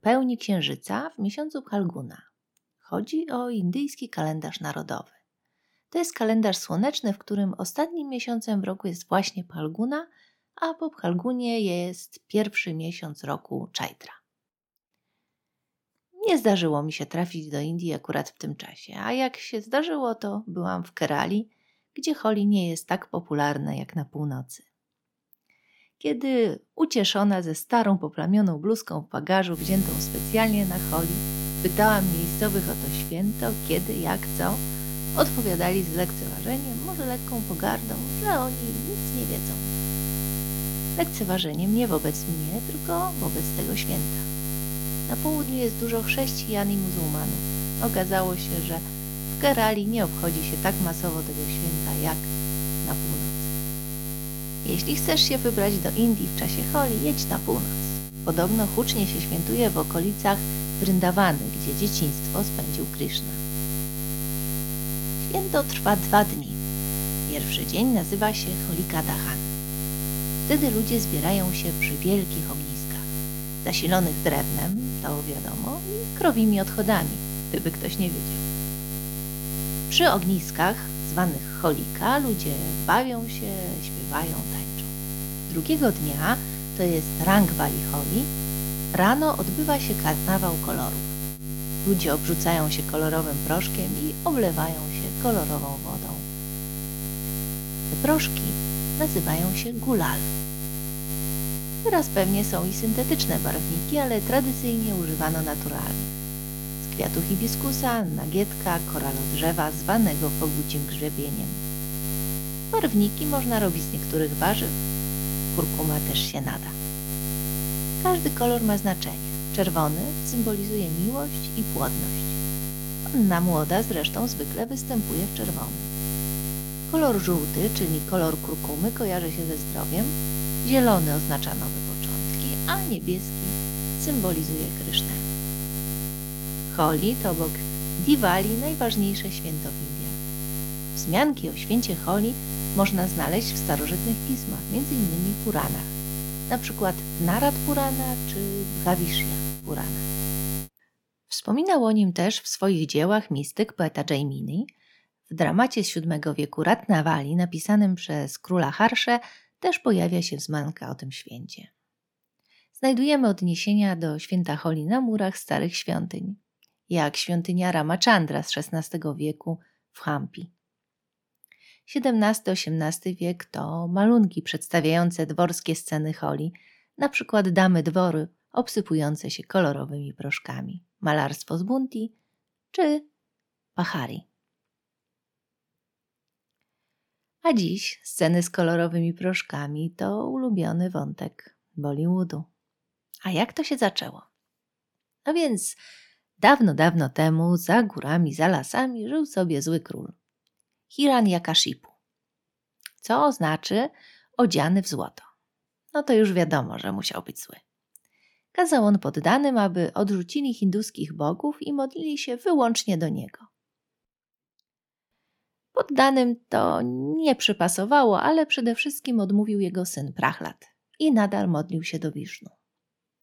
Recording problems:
electrical hum; loud; from 30 s to 2:31; 60 Hz, 8 dB below the speech

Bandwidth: 18 kHz